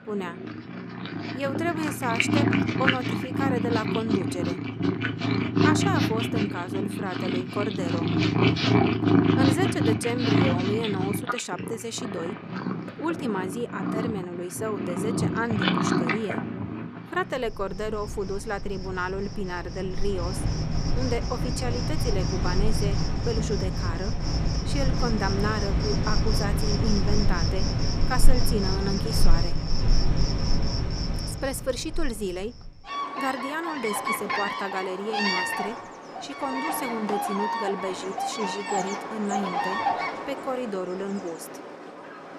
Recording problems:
animal sounds; very loud; throughout; 4 dB above the speech

